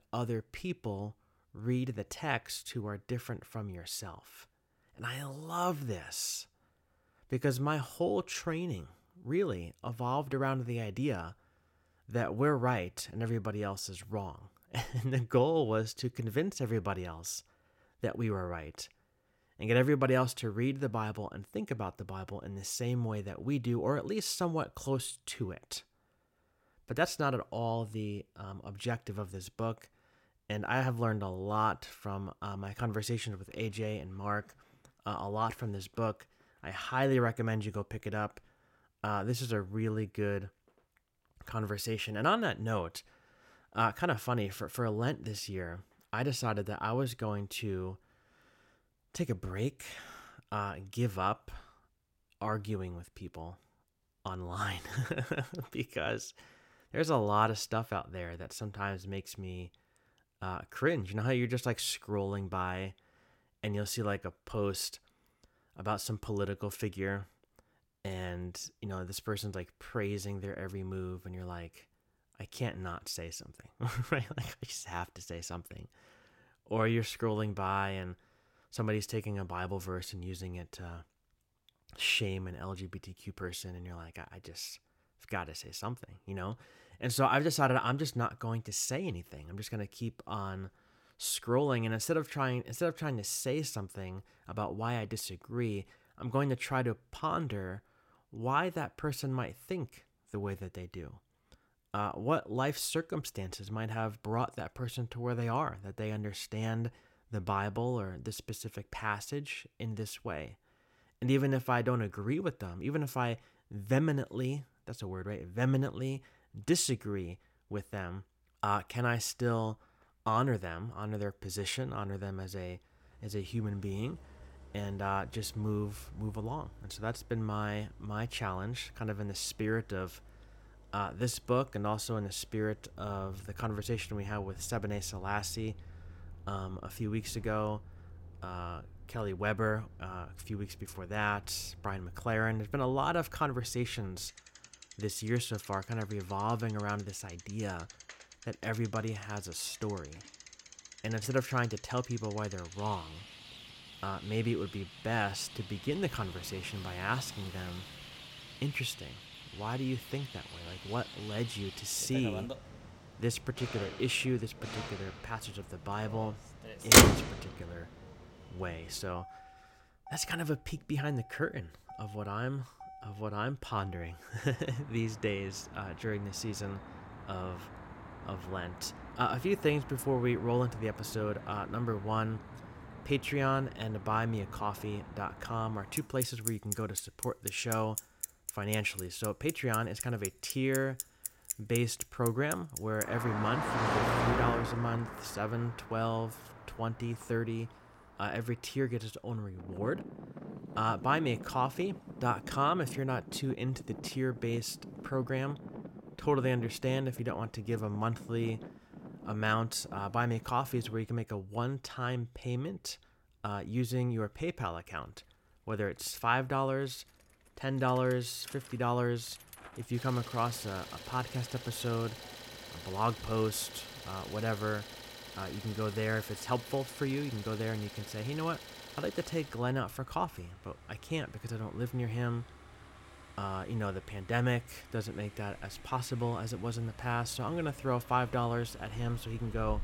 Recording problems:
traffic noise; loud; from 2:03 on; 3 dB below the speech

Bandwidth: 16.5 kHz